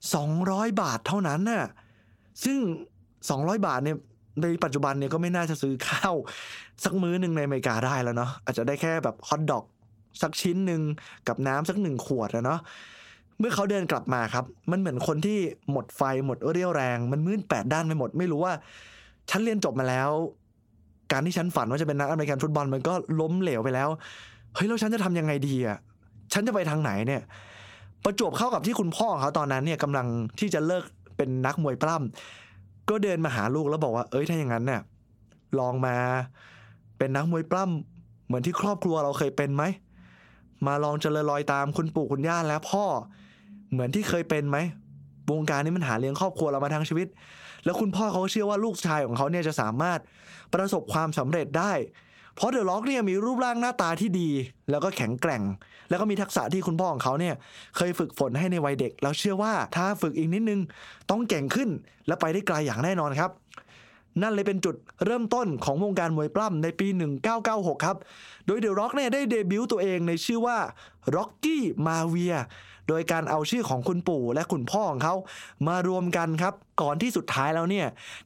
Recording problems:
squashed, flat; heavily

